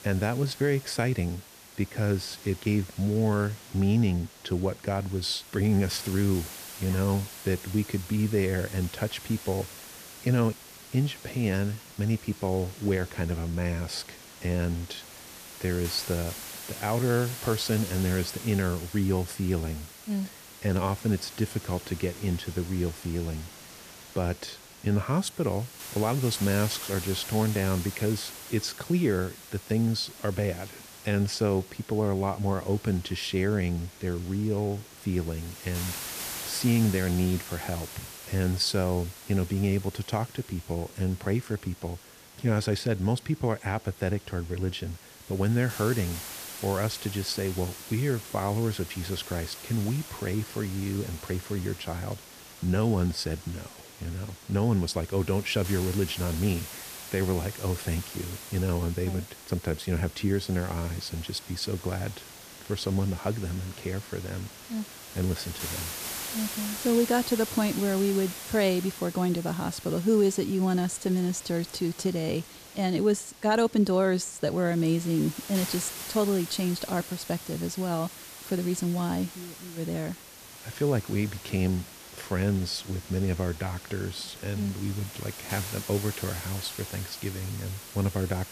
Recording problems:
hiss; noticeable; throughout; 10 dB below the speech

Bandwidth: 14.5 kHz